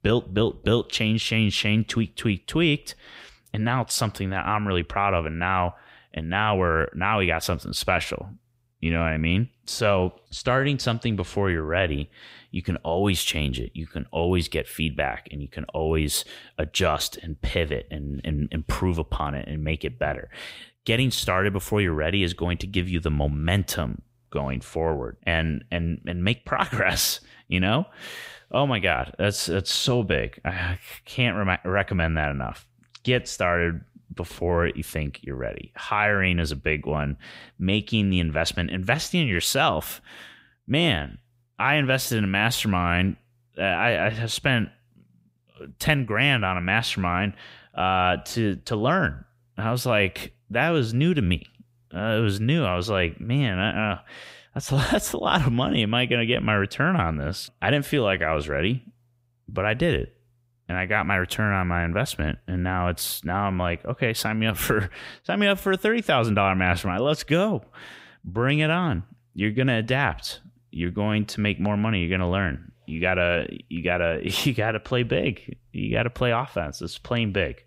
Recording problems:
none

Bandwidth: 15.5 kHz